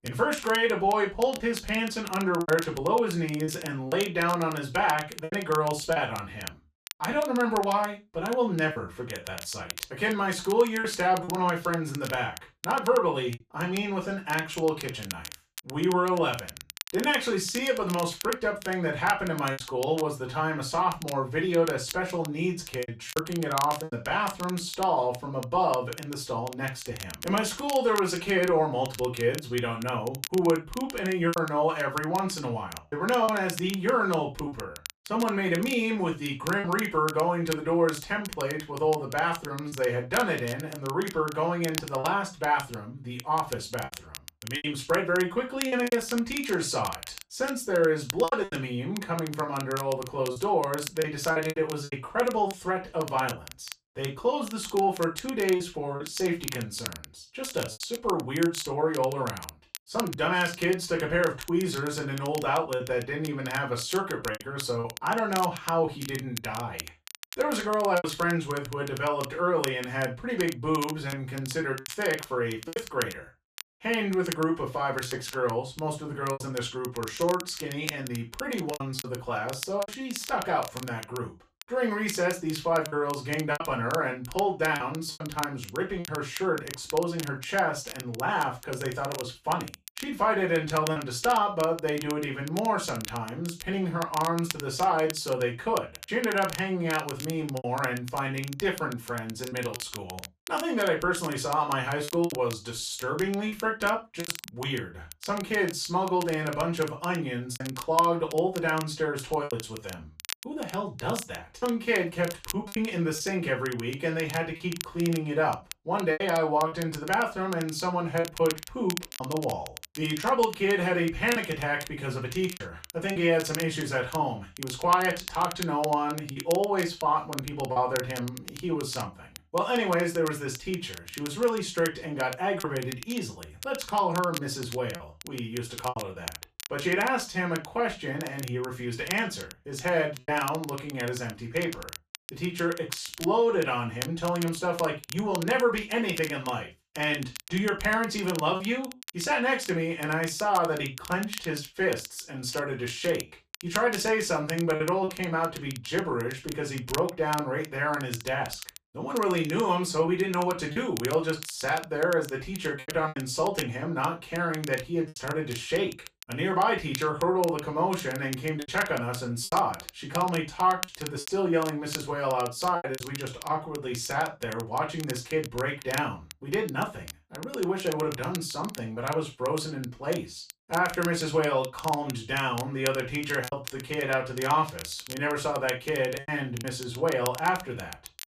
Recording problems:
off-mic speech; far
room echo; slight; dies away in 0.2 s
crackle, like an old record; noticeable; 15 dB below the speech
choppy; occasionally; 3% of the speech affected

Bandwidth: 14.5 kHz